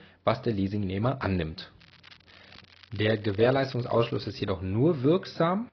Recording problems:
garbled, watery; badly
high frequencies cut off; noticeable; nothing above 5.5 kHz
crackling; faint; from 2 to 4.5 s; 25 dB below the speech

